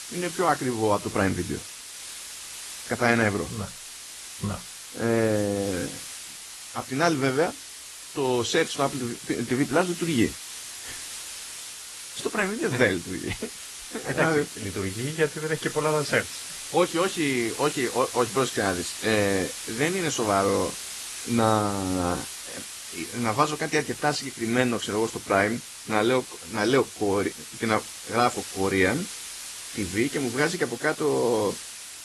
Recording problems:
garbled, watery; slightly
hiss; loud; throughout; 9 dB below the speech

